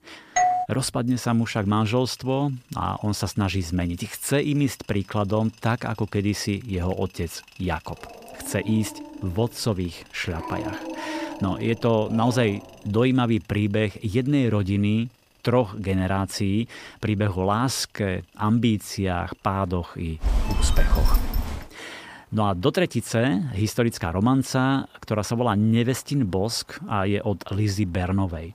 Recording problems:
machinery noise; faint; throughout; 30 dB below the speech
doorbell; loud; at 0.5 s; peak 3 dB above the speech
dog barking; noticeable; from 8 to 13 s; peak 8 dB below the speech
phone ringing; loud; from 20 to 22 s; peak 1 dB above the speech

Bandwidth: 15 kHz